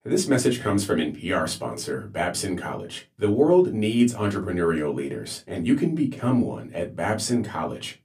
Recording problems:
room echo; very slight; dies away in 0.2 s
off-mic speech; somewhat distant

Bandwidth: 15 kHz